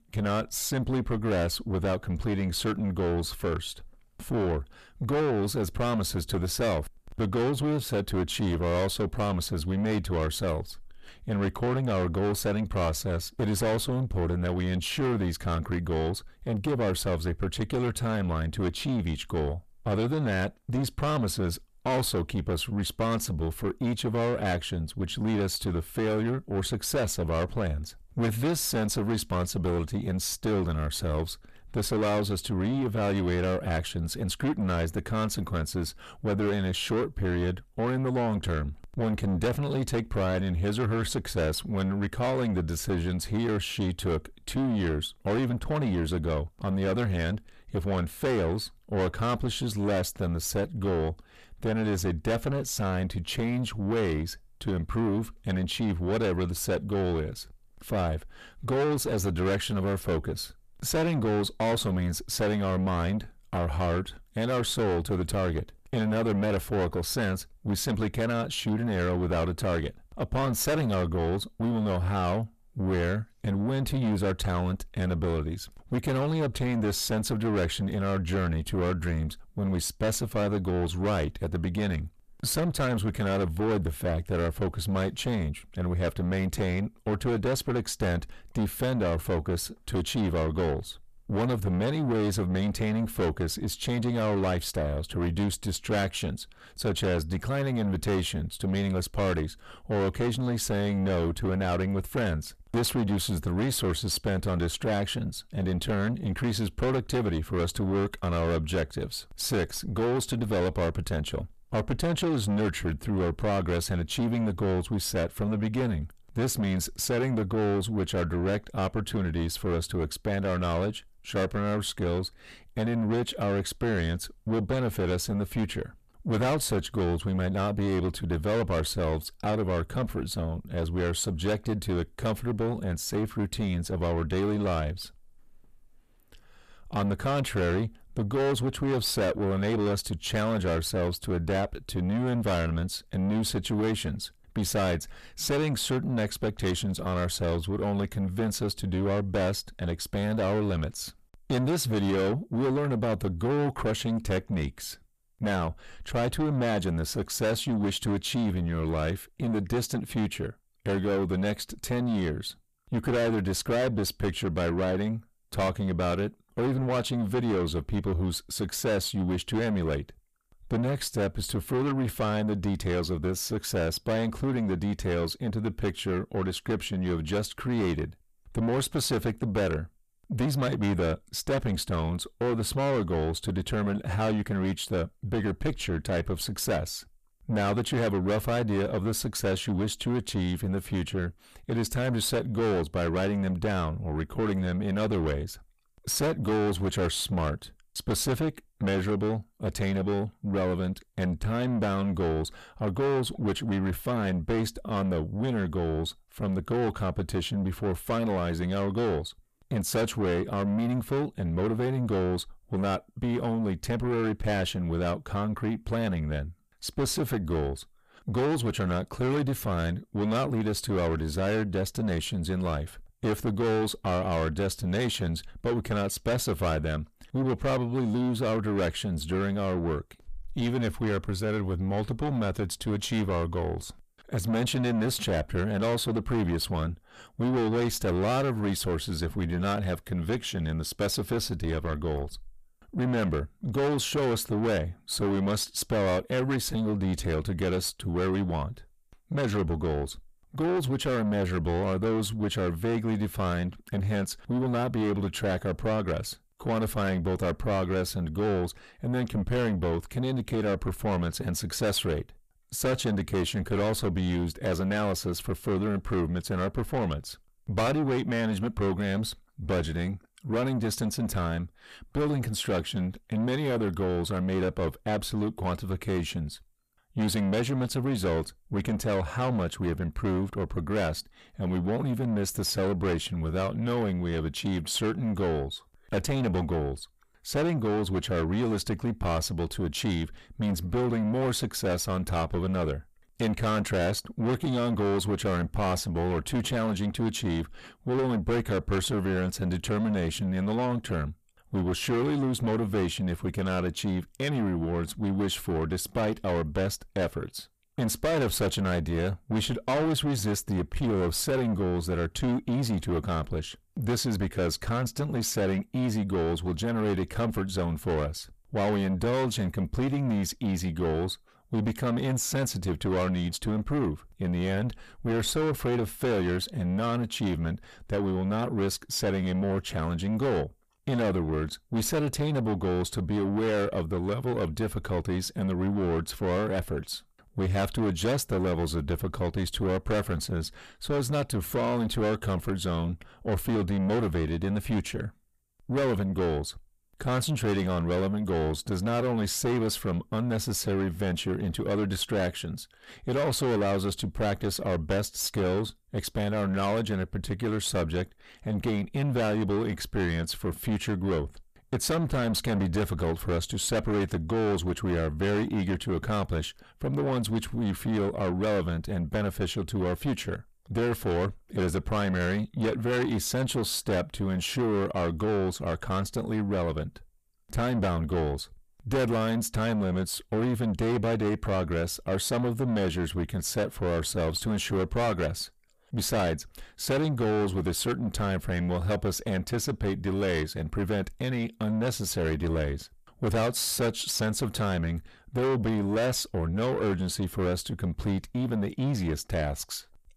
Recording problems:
distortion; heavy; 8 dB below the speech

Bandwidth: 14.5 kHz